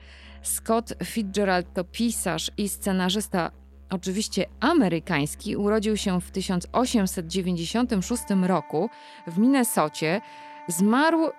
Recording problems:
background music; faint; throughout; 20 dB below the speech

